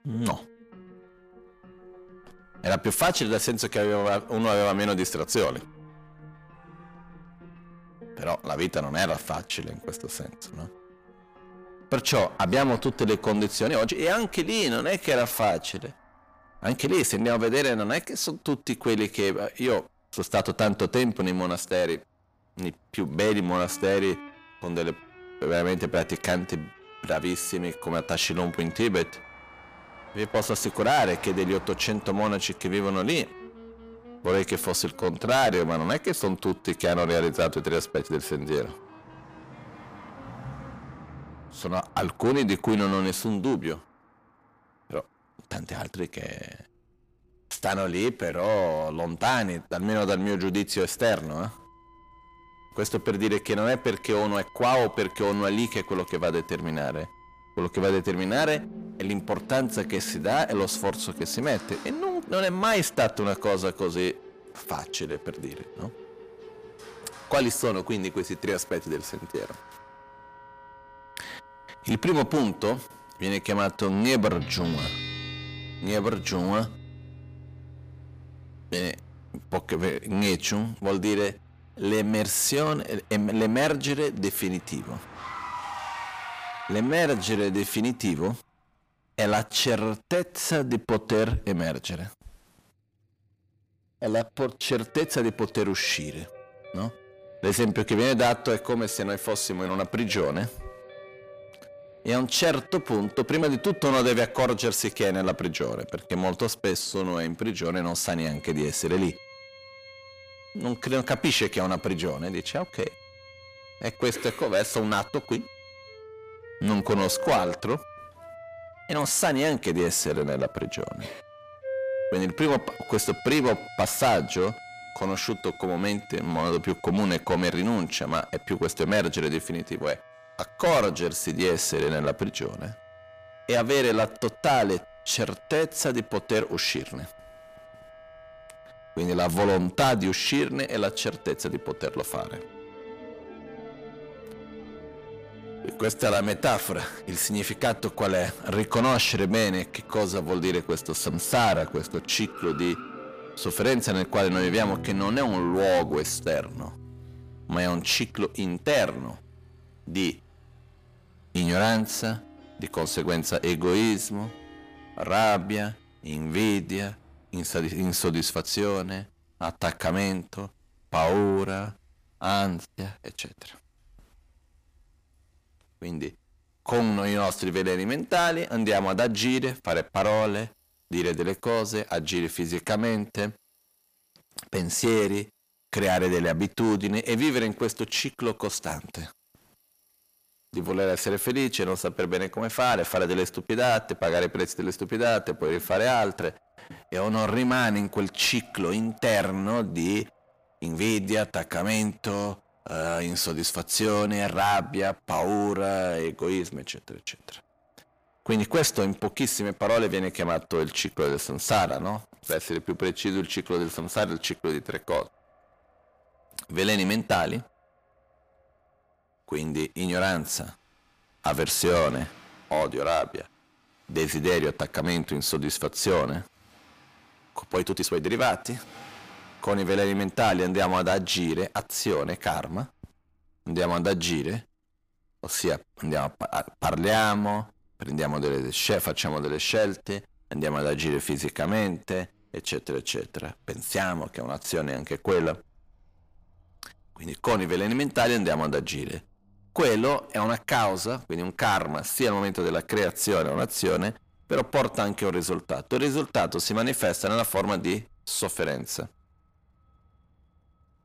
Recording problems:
distortion; heavy; 6 dB below the speech
background music; noticeable; until 2:46; 20 dB below the speech
traffic noise; faint; throughout; 25 dB below the speech
uneven, jittery; strongly; from 14 s to 3:58

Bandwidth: 15 kHz